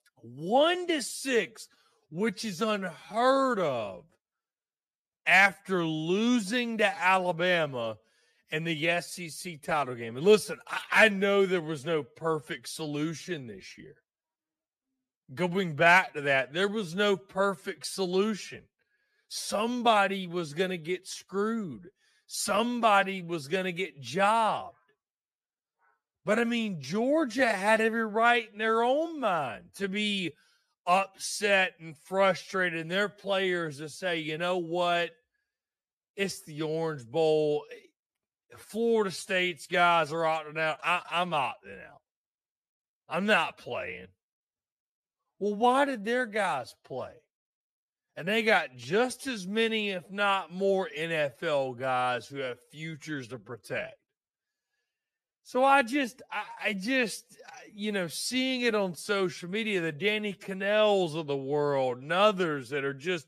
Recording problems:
wrong speed, natural pitch; too slow; 0.6 times normal speed

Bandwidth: 14.5 kHz